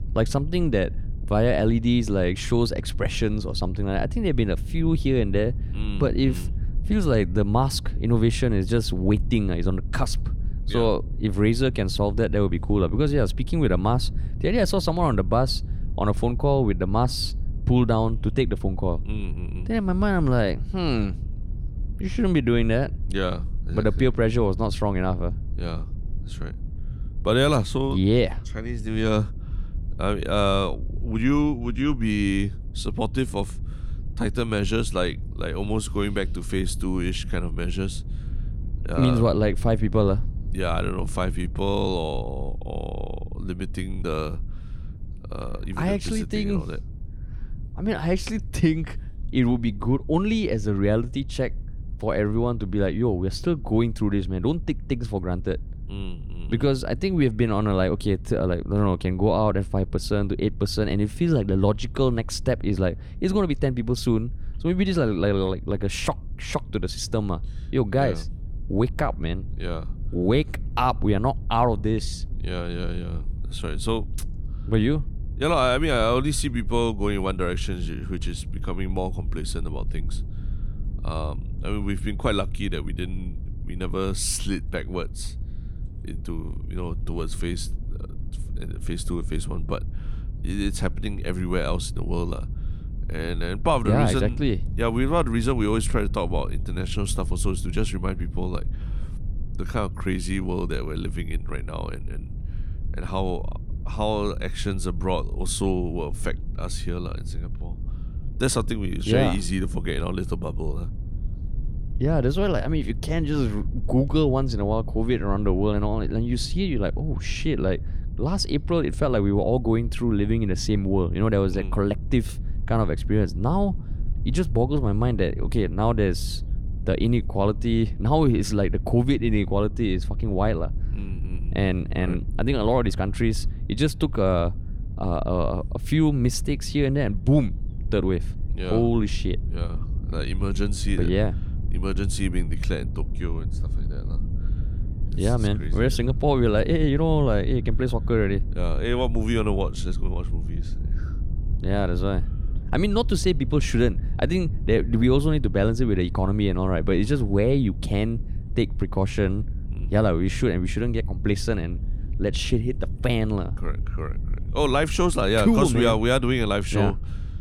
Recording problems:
low rumble; faint; throughout; 20 dB below the speech

